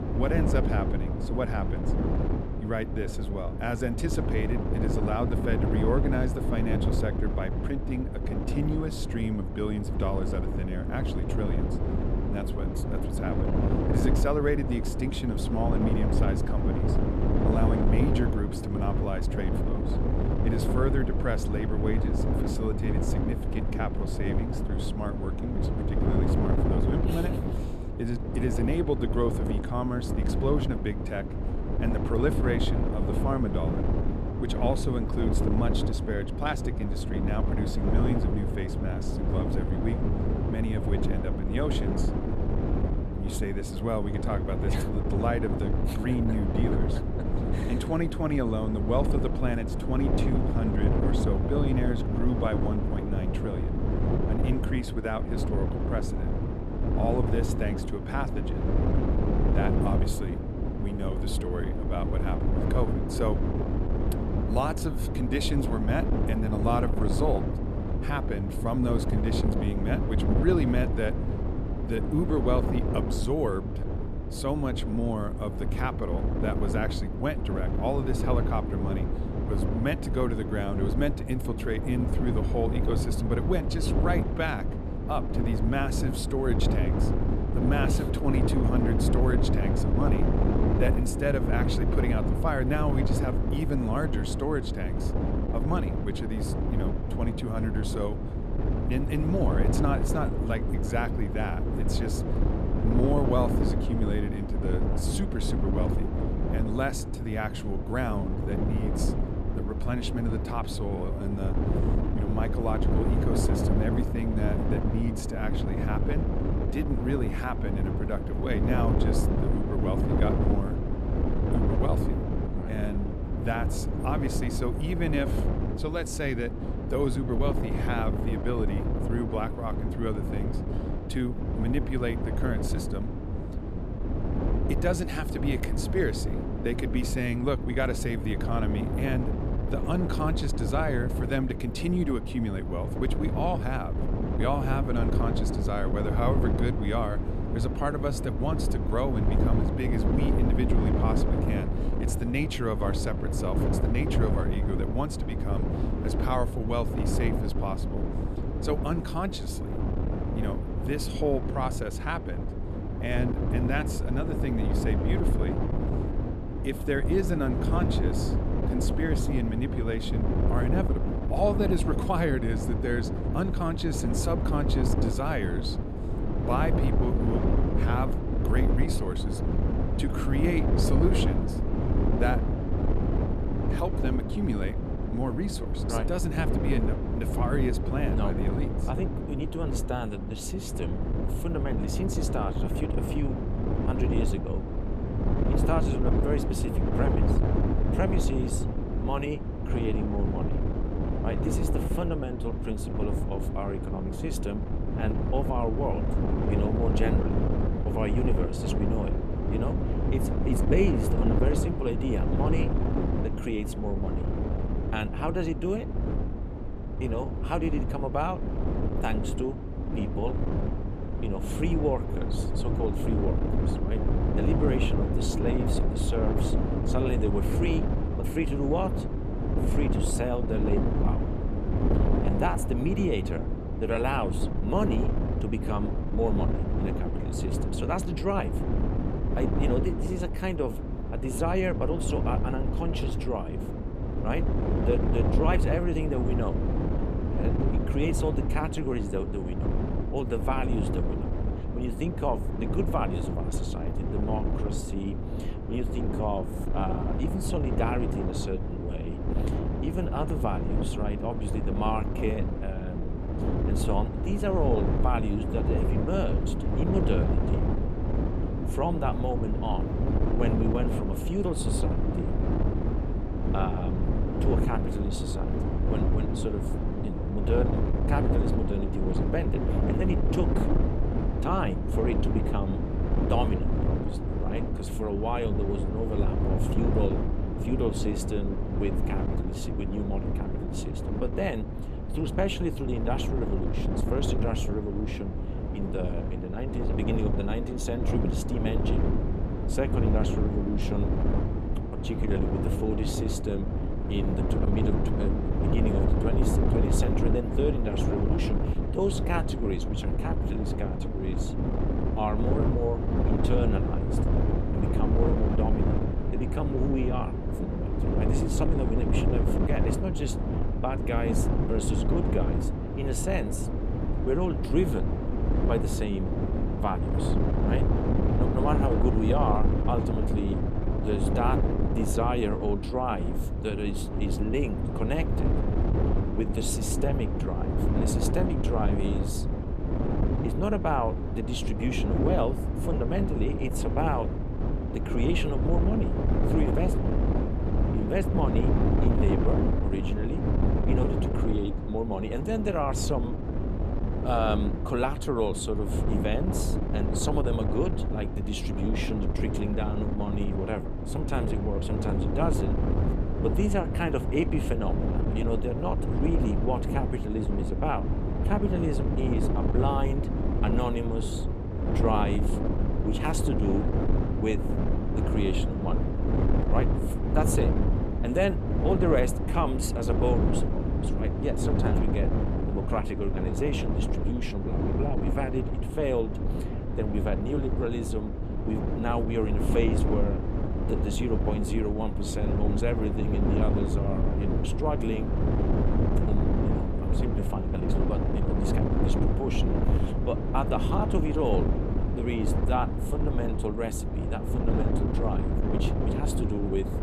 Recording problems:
wind noise on the microphone; heavy; 2 dB below the speech

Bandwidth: 14 kHz